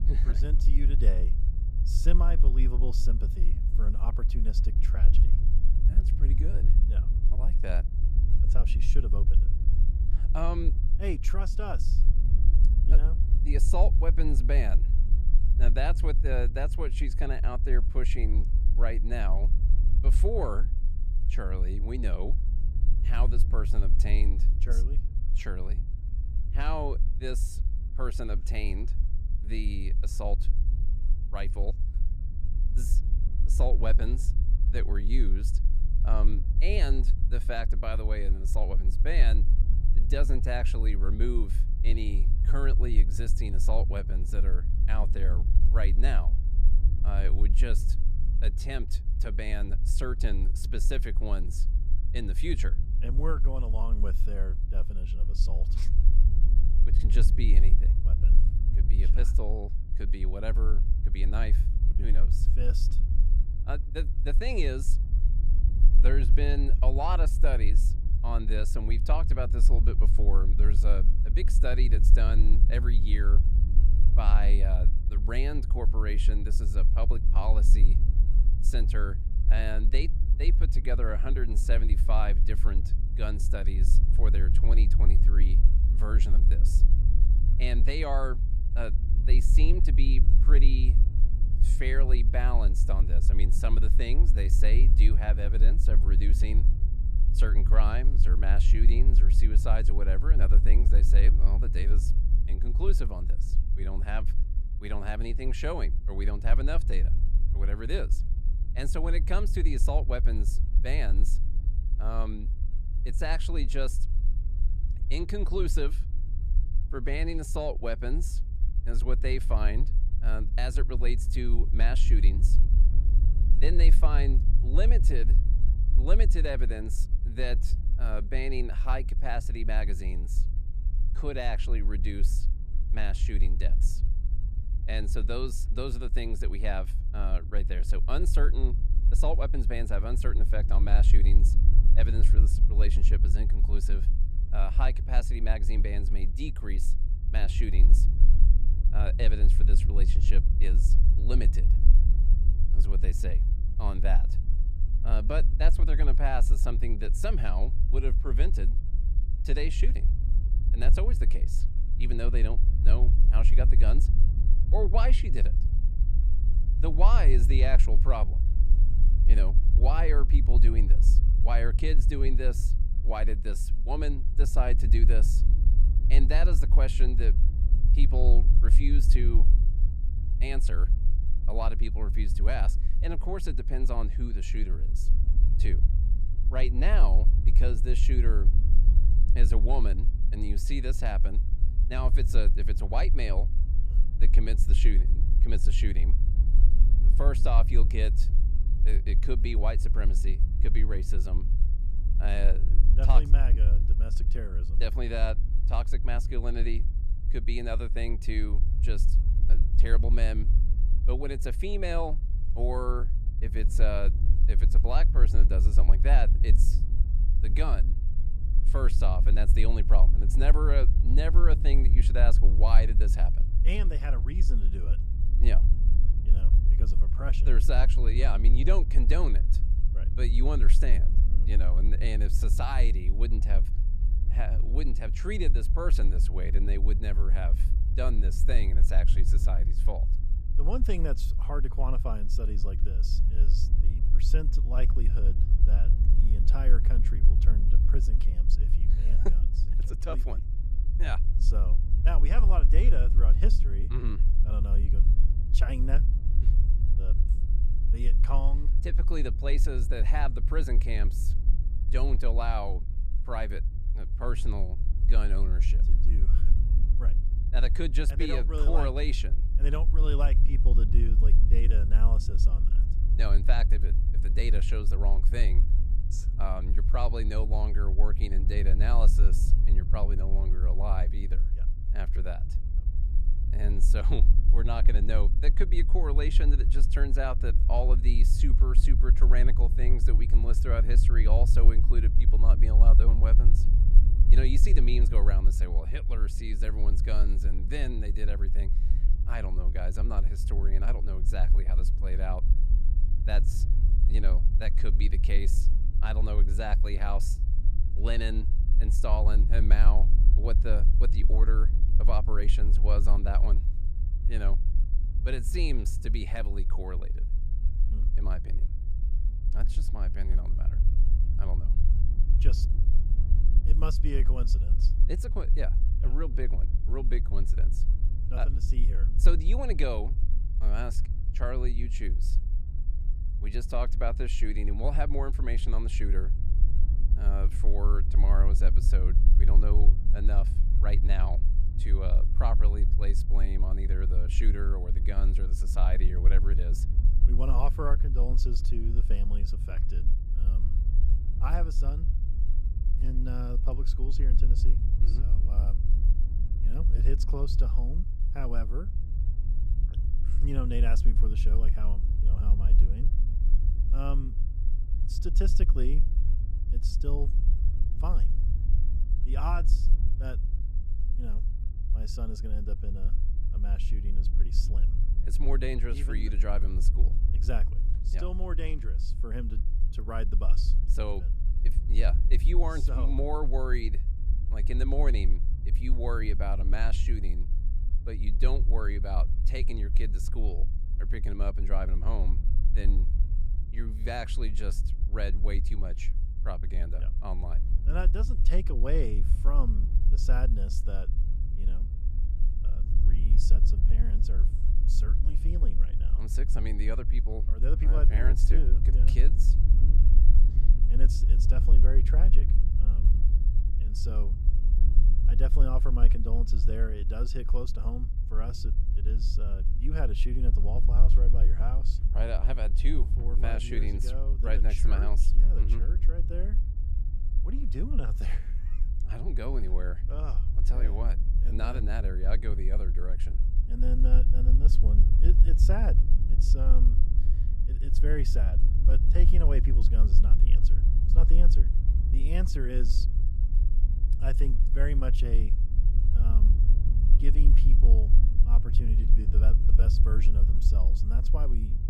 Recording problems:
low rumble; loud; throughout; 10 dB below the speech

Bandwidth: 14.5 kHz